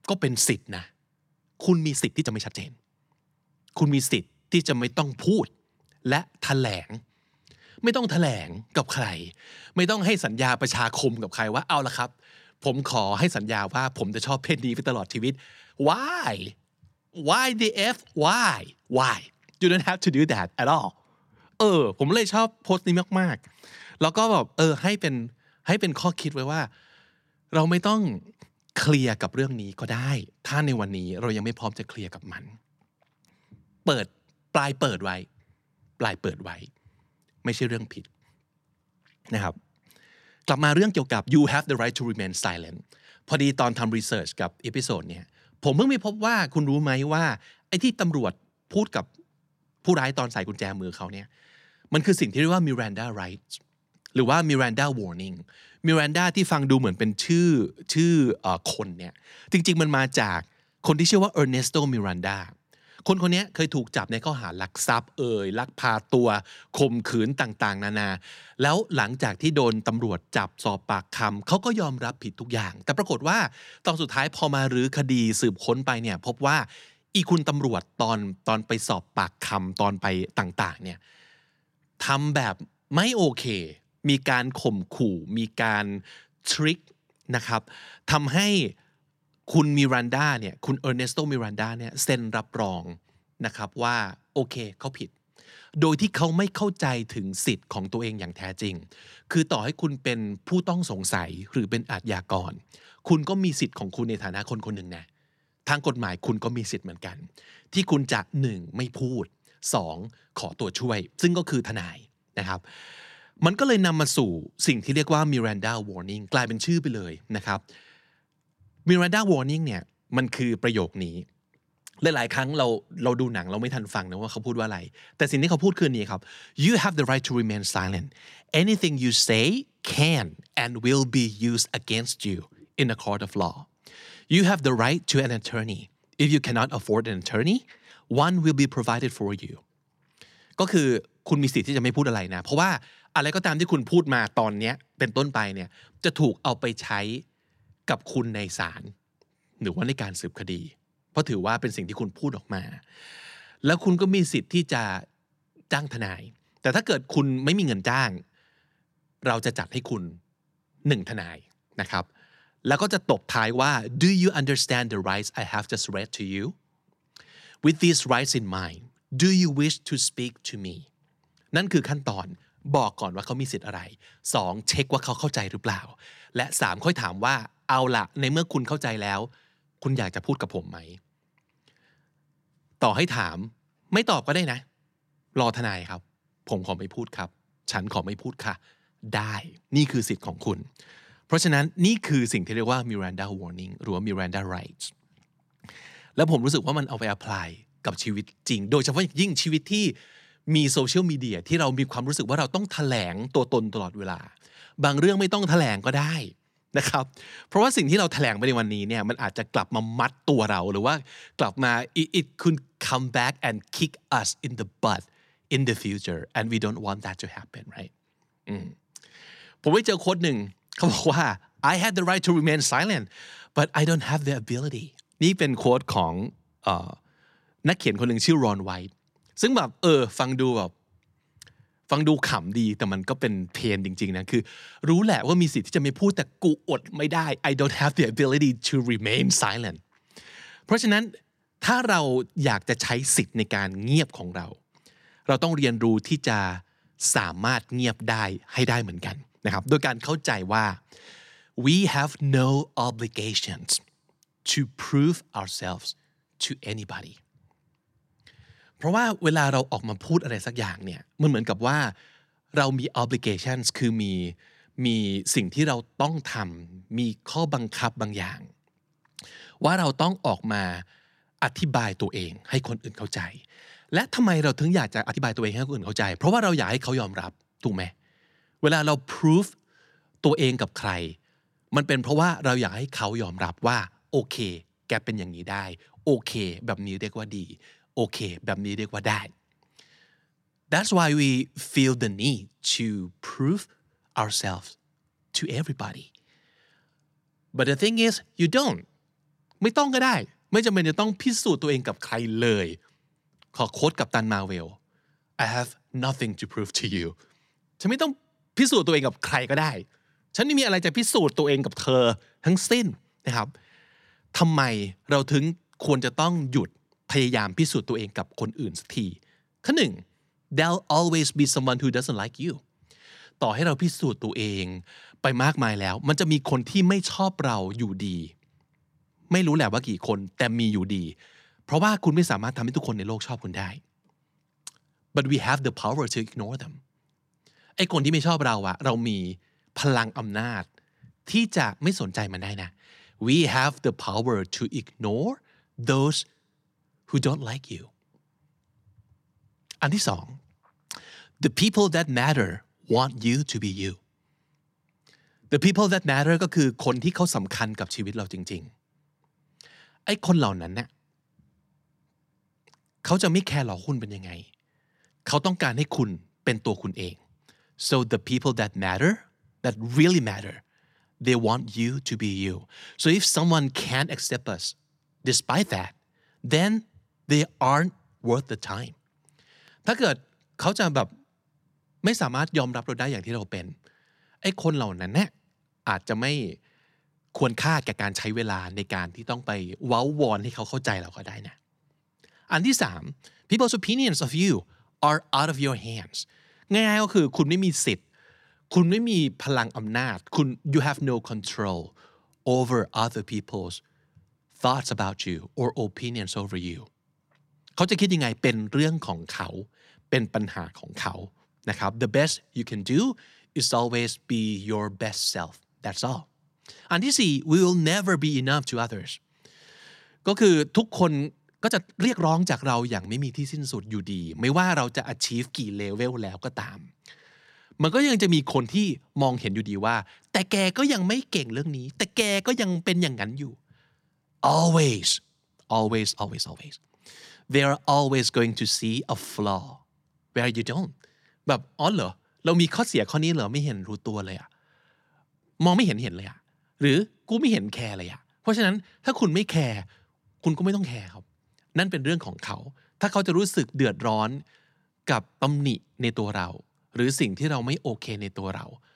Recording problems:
uneven, jittery; strongly; from 2 s to 7:26

